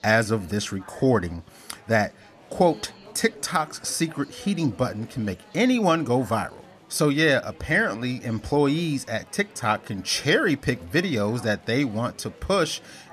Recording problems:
murmuring crowd; faint; throughout; 25 dB below the speech

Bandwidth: 14 kHz